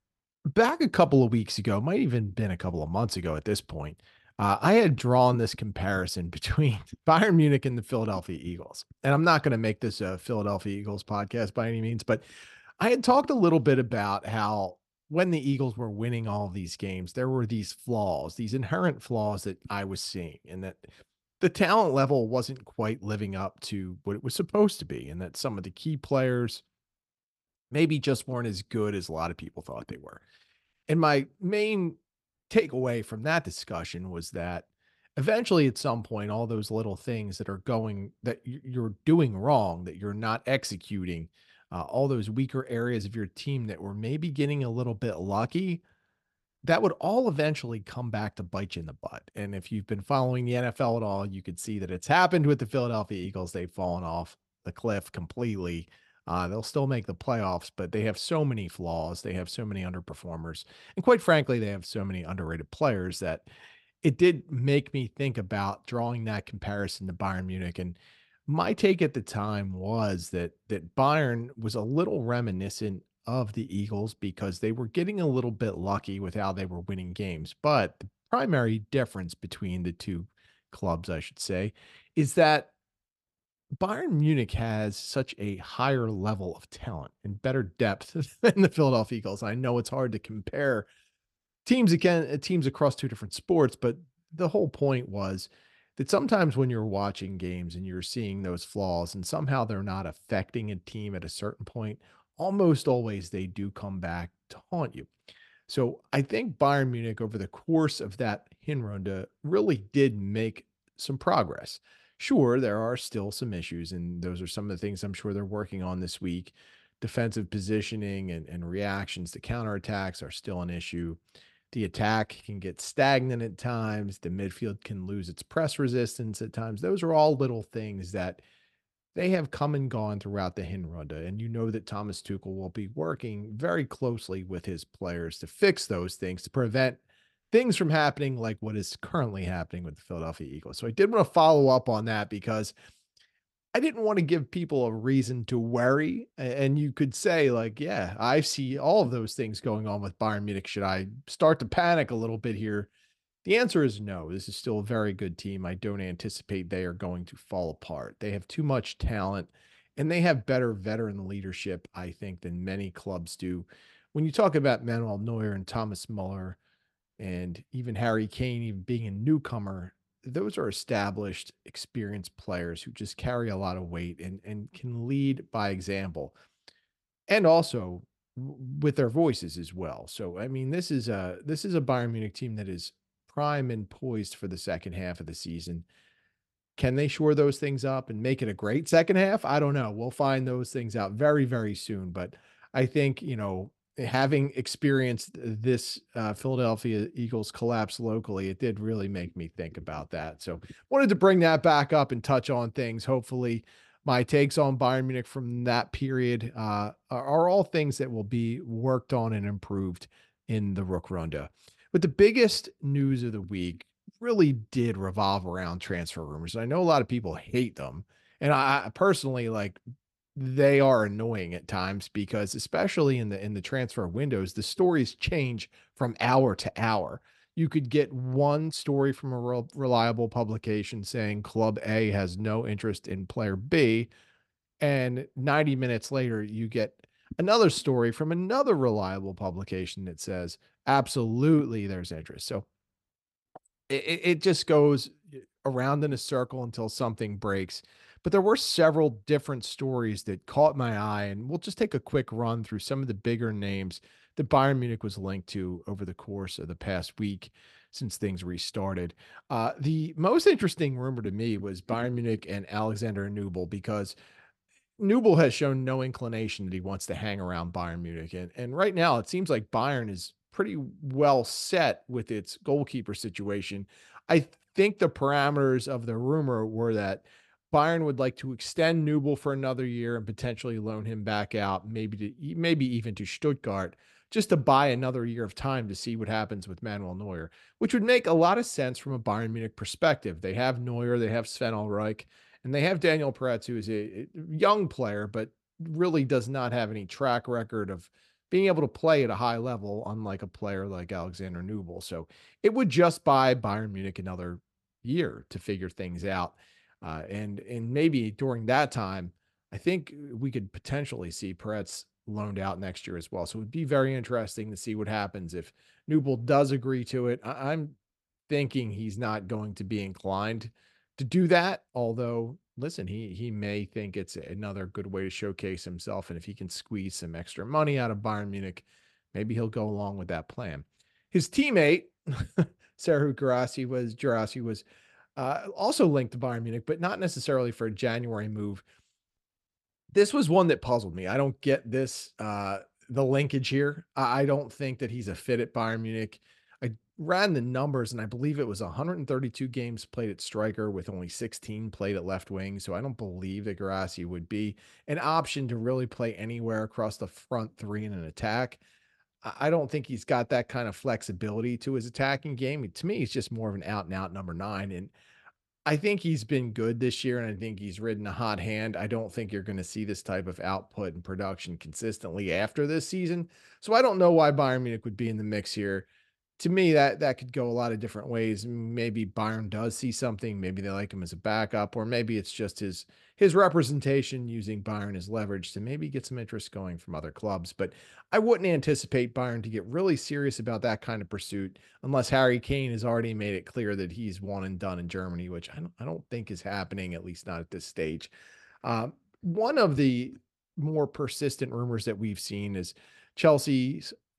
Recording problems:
none

